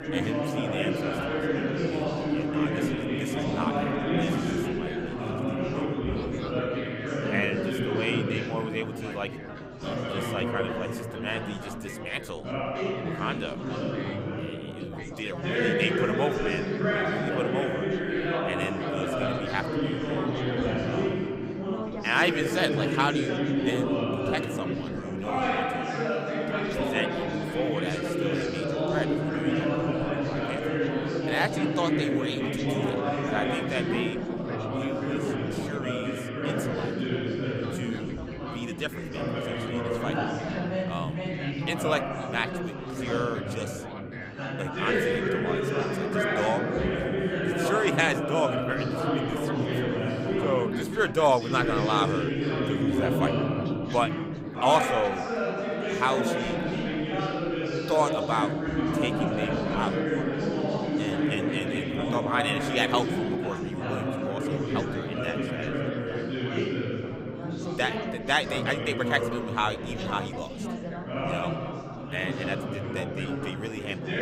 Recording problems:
chatter from many people; very loud; throughout; 2 dB above the speech

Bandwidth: 15.5 kHz